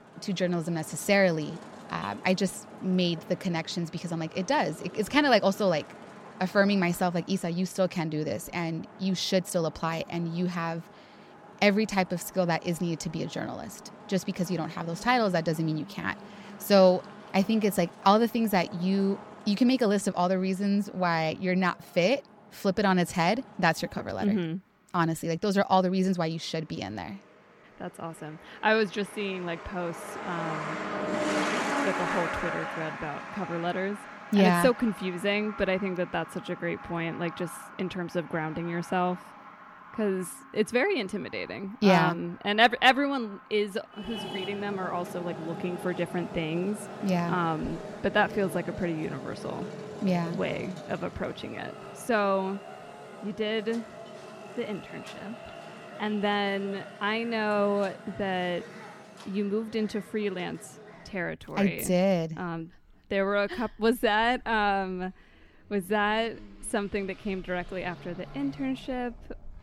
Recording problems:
traffic noise; noticeable; throughout; 10 dB below the speech

